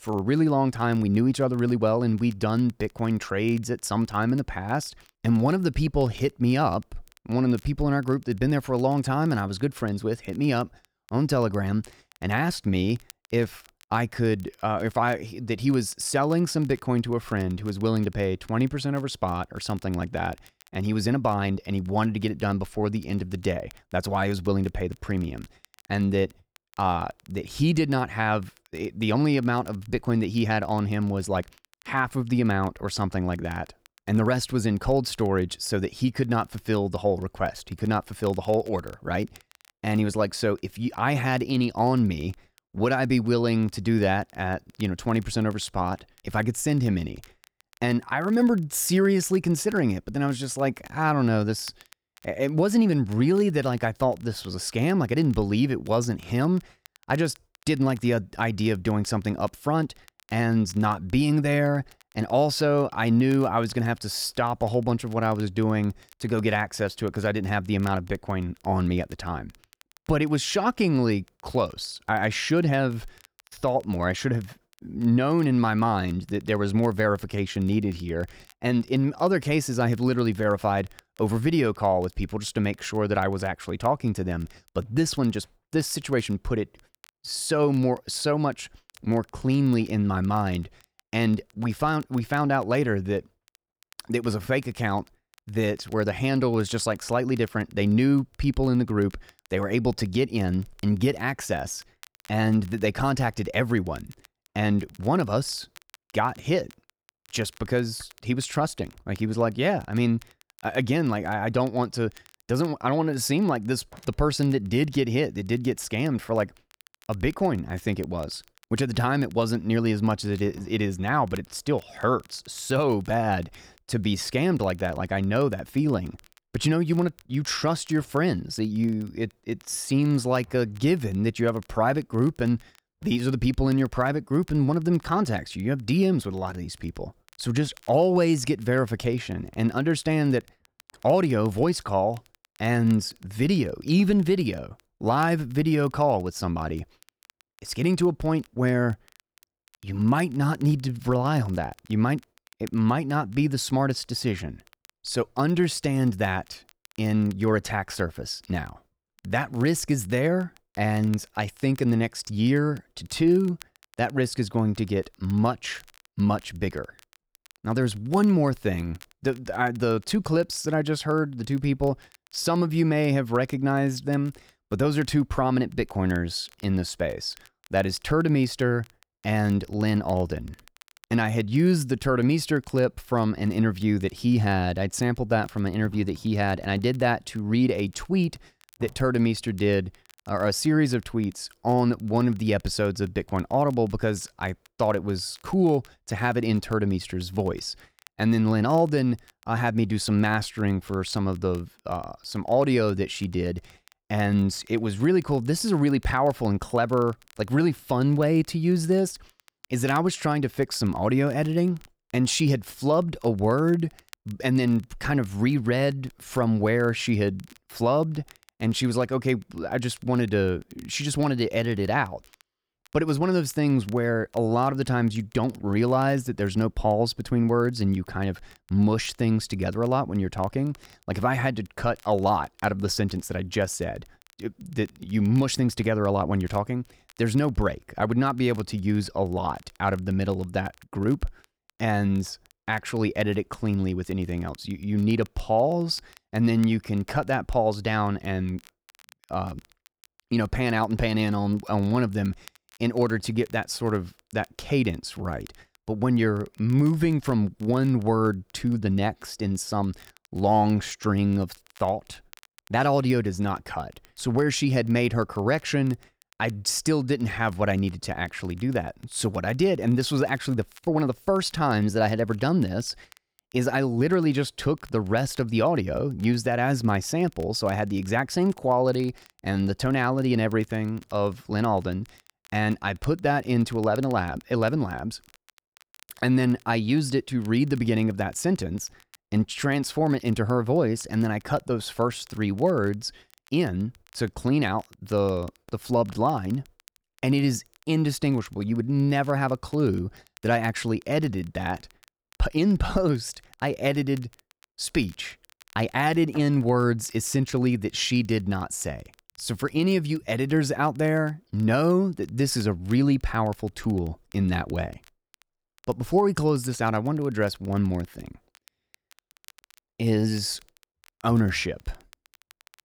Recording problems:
crackle, like an old record; faint; 30 dB below the speech

